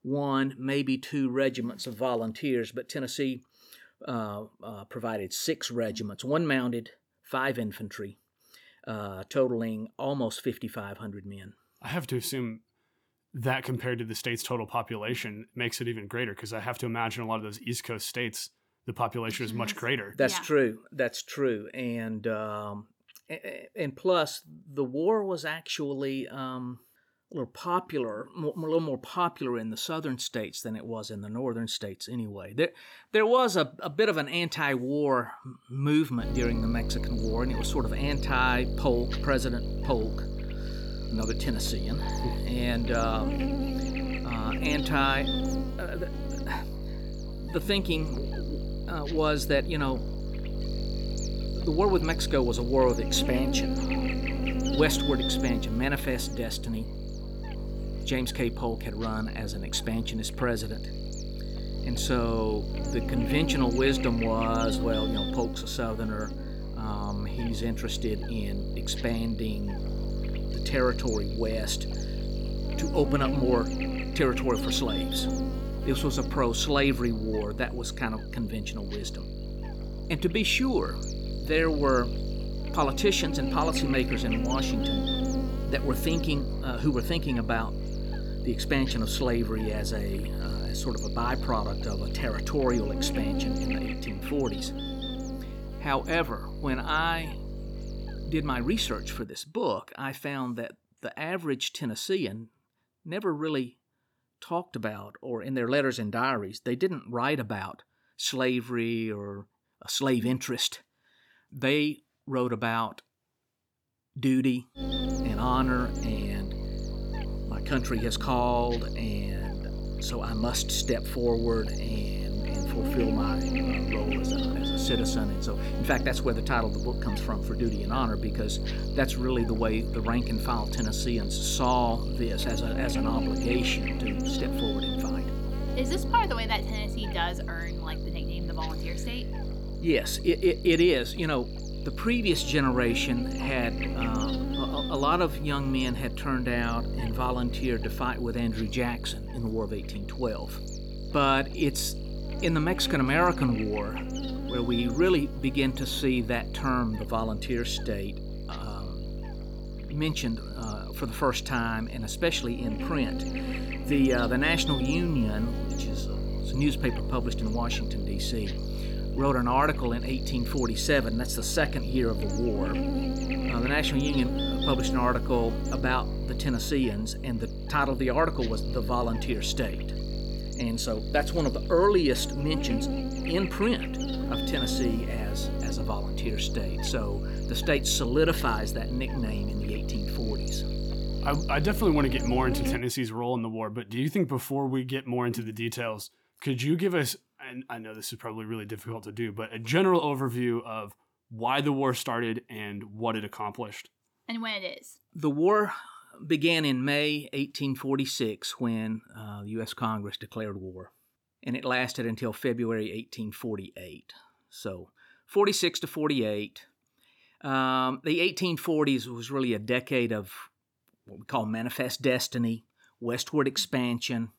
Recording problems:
electrical hum; loud; from 36 s to 1:39 and from 1:55 to 3:13; 50 Hz, 8 dB below the speech

